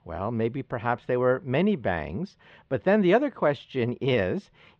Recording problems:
muffled; slightly; fading above 4 kHz

